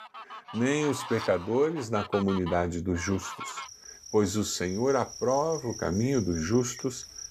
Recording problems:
animal sounds; noticeable; throughout; 10 dB below the speech

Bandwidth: 14.5 kHz